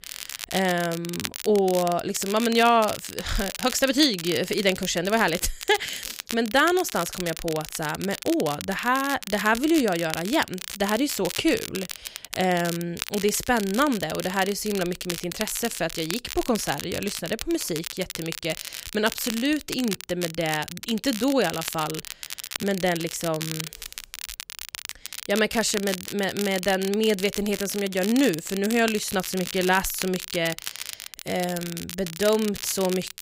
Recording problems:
crackle, like an old record; loud; 9 dB below the speech

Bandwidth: 15.5 kHz